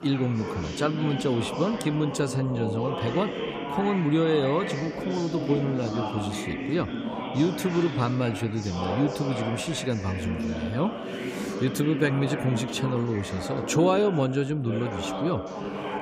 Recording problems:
background chatter; loud; throughout; 4 voices, 5 dB below the speech

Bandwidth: 15 kHz